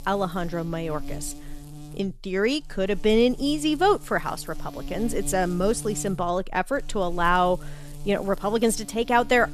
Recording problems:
electrical hum; faint; throughout; 60 Hz, 20 dB below the speech

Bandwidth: 13.5 kHz